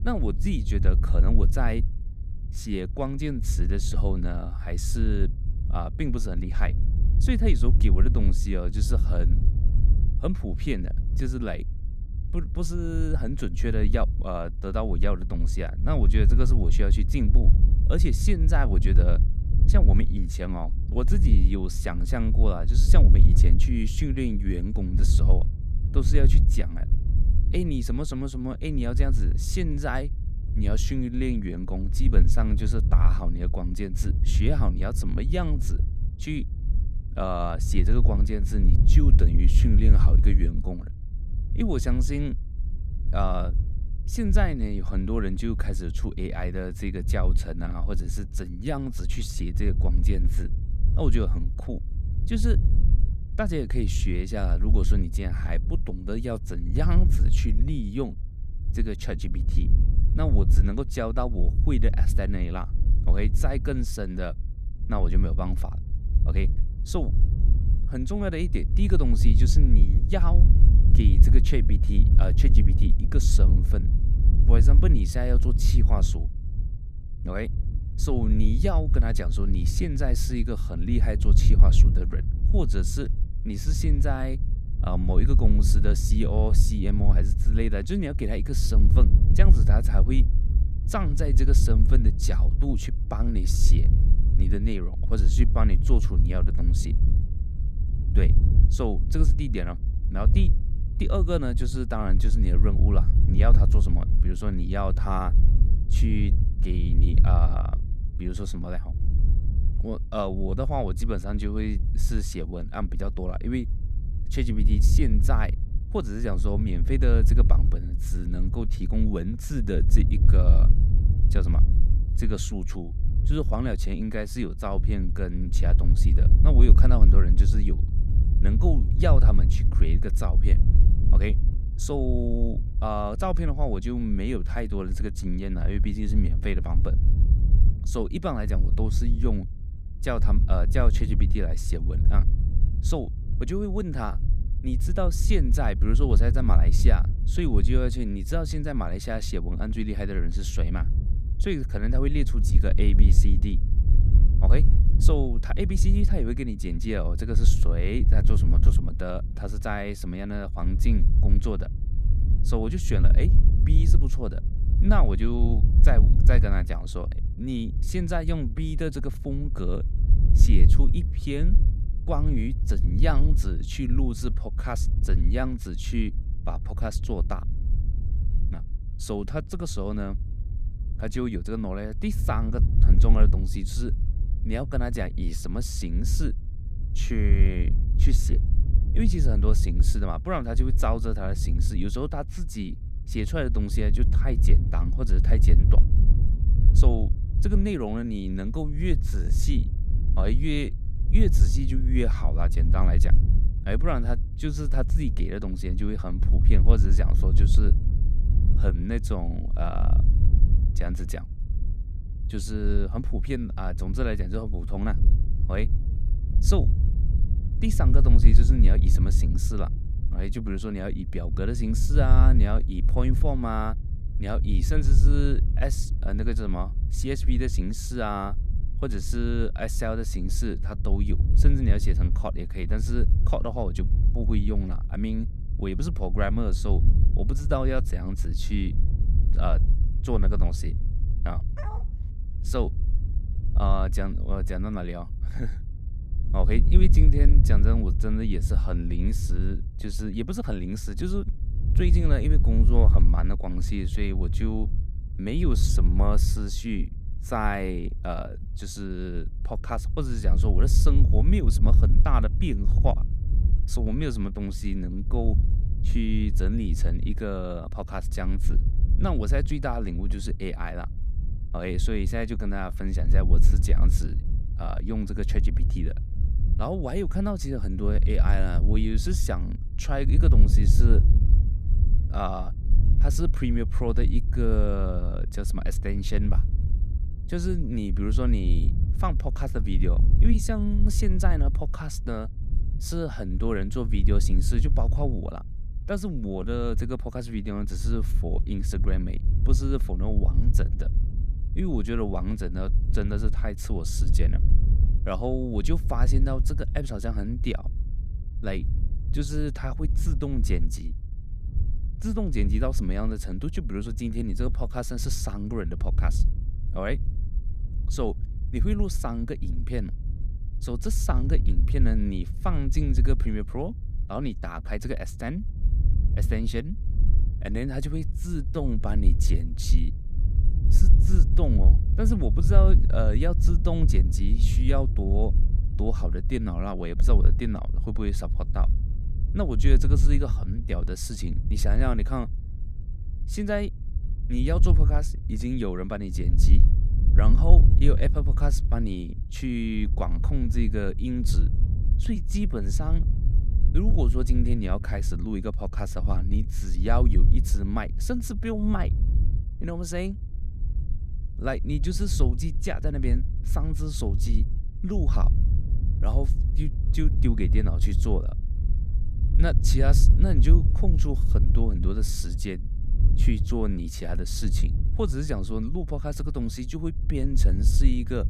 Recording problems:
wind noise on the microphone; heavy; 9 dB below the speech
dog barking; faint; at 4:02; peak 10 dB below the speech

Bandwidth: 14.5 kHz